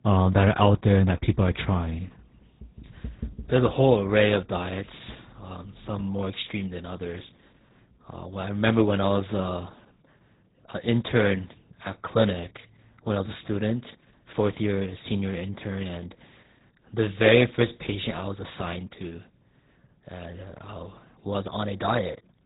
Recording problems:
garbled, watery; badly
high frequencies cut off; severe; nothing above 4 kHz

